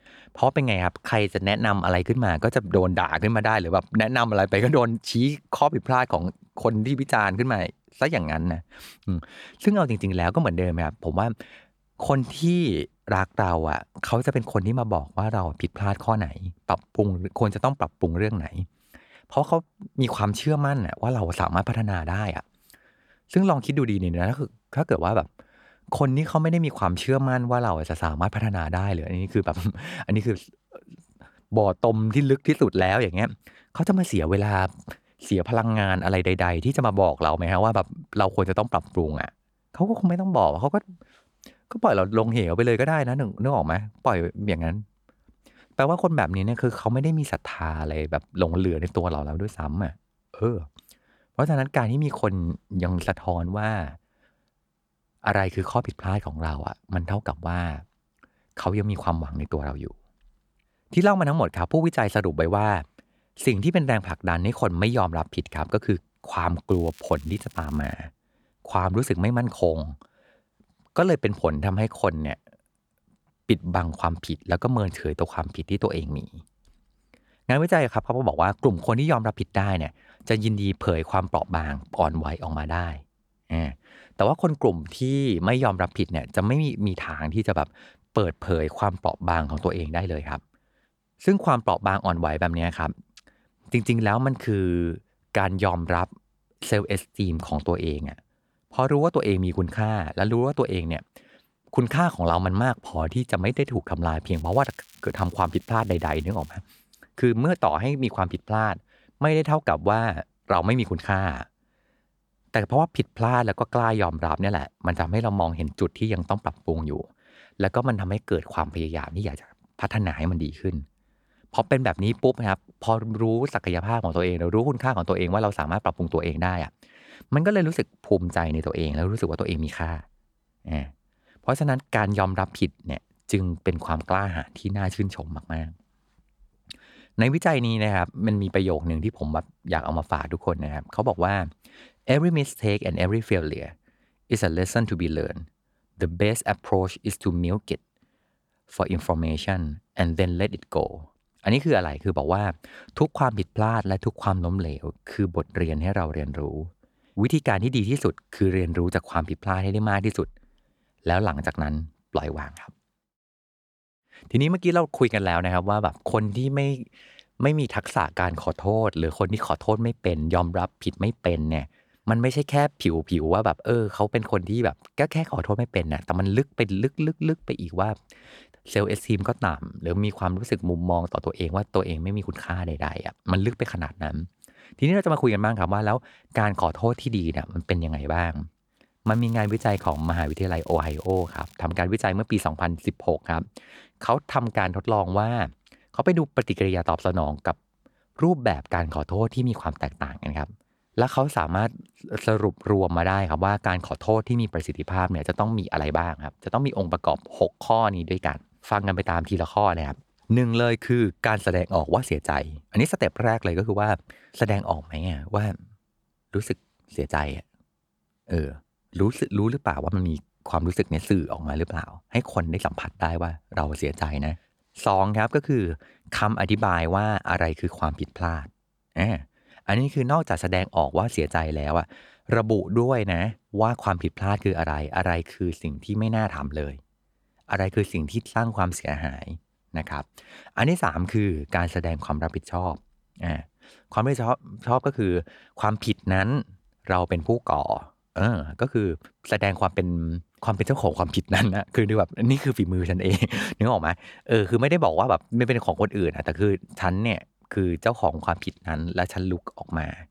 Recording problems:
crackling; faint; from 1:07 to 1:08, from 1:44 to 1:47 and from 3:09 to 3:12; 25 dB below the speech

